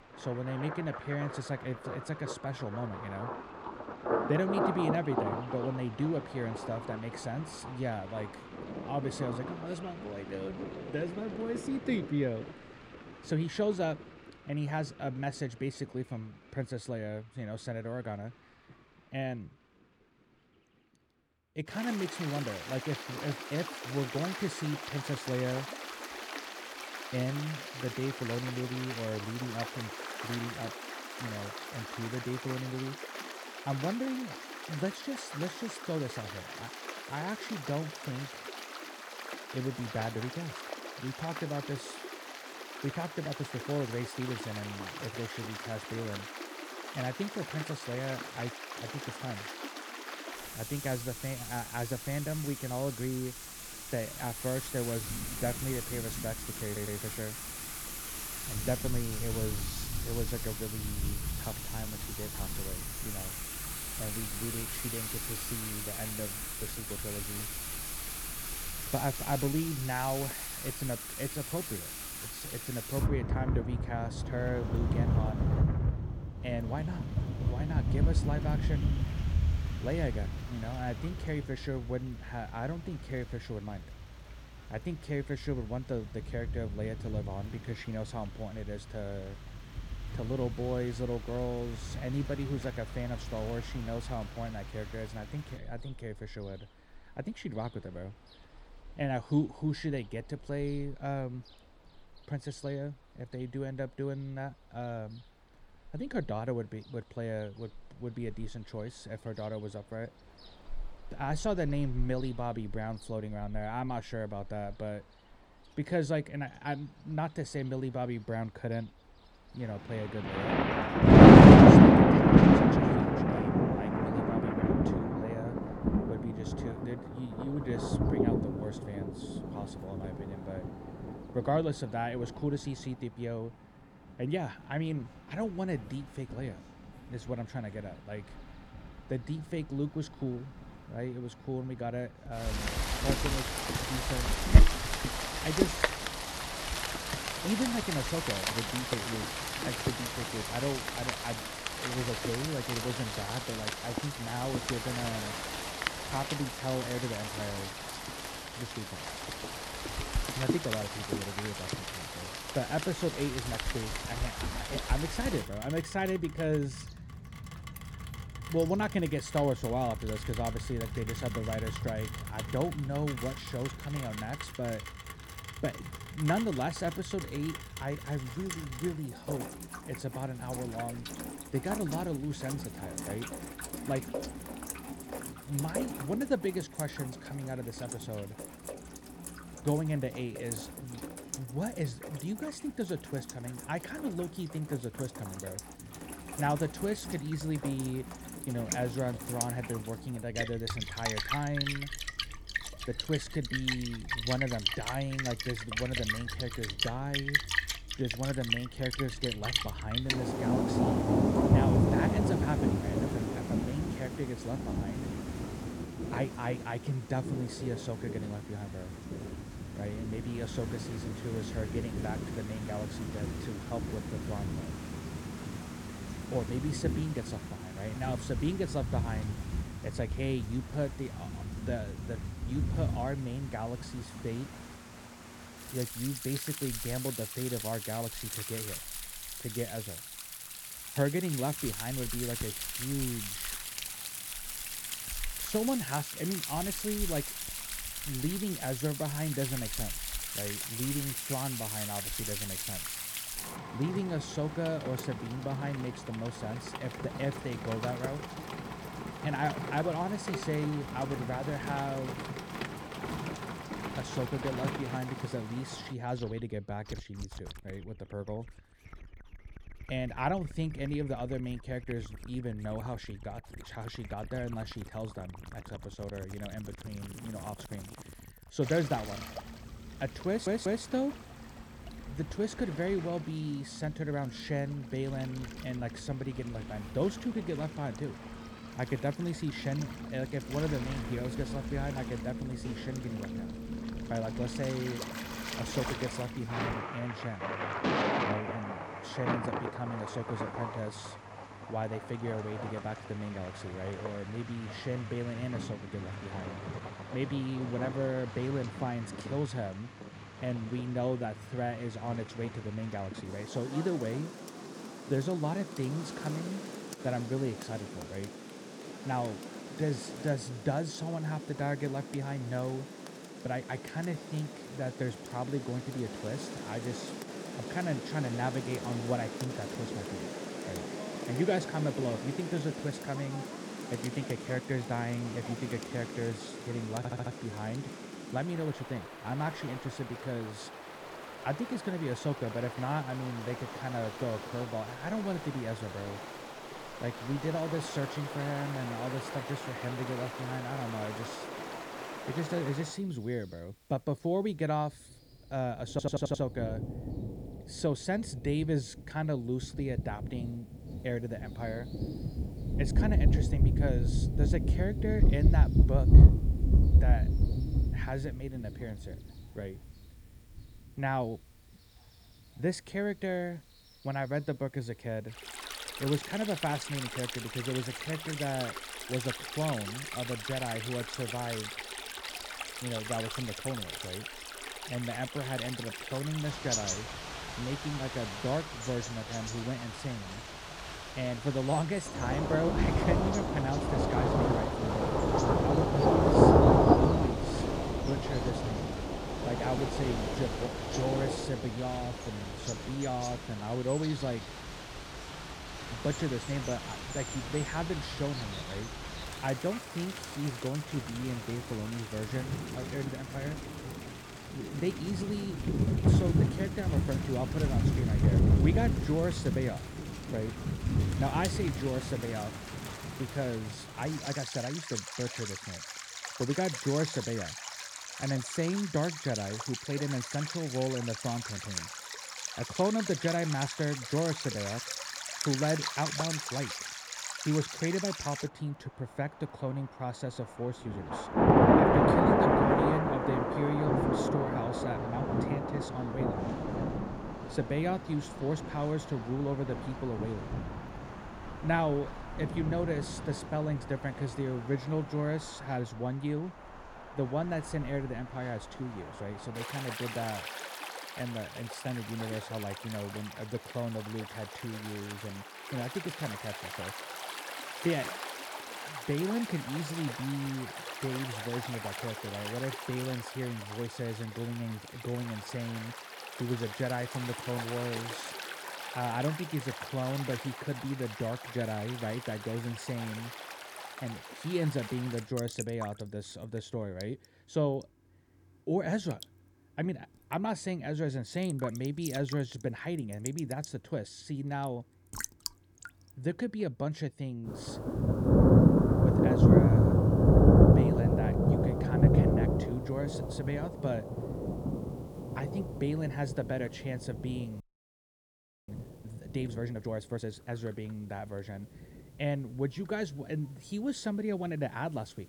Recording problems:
rain or running water; very loud; throughout; 4 dB above the speech
audio stuttering; 4 times, first at 57 s
audio freezing; at 8:28 for 1 s

